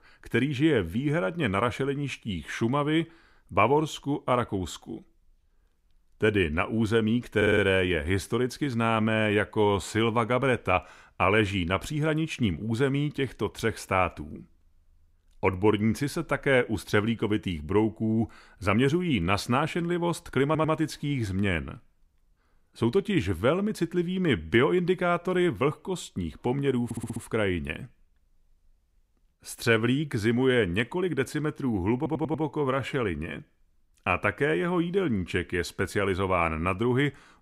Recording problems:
audio stuttering; 4 times, first at 7.5 s

